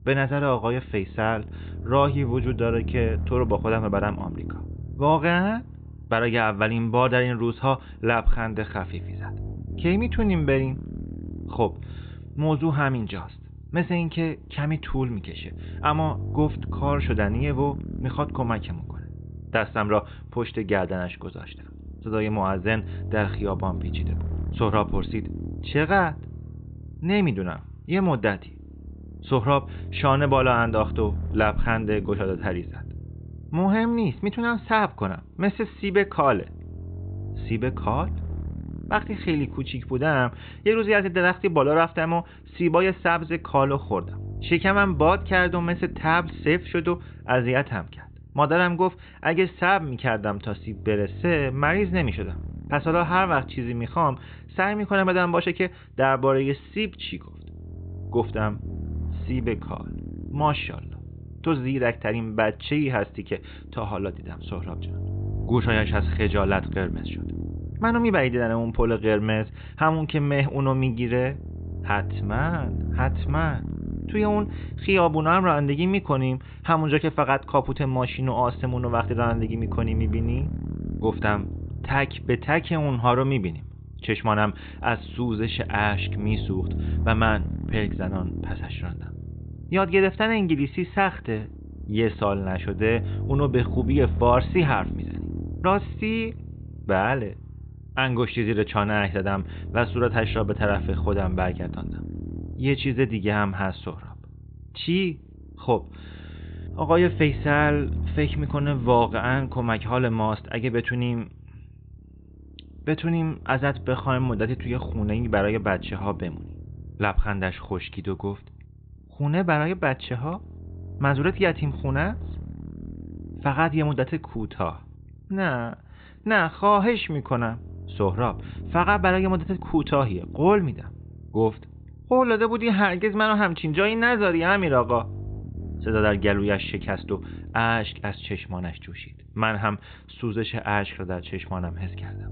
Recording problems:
high frequencies cut off; severe; nothing above 4 kHz
low rumble; faint; throughout; 20 dB below the speech

